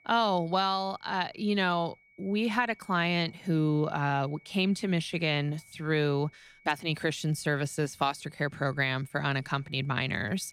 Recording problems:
high-pitched whine; faint; throughout; 2 kHz, 30 dB below the speech

